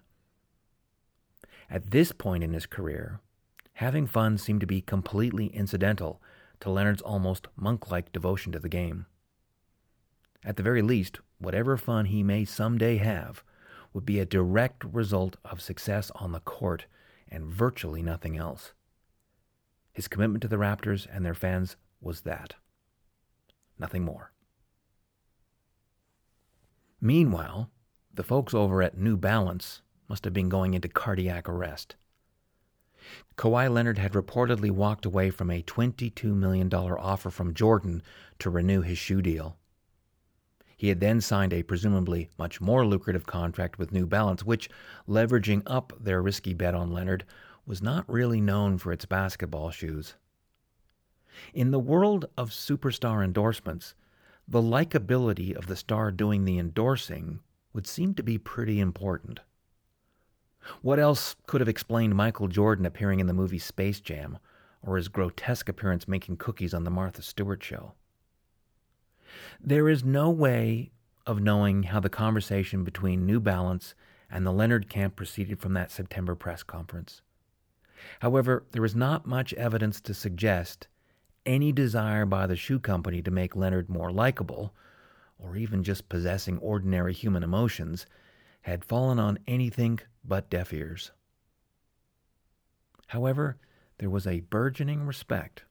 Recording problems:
none

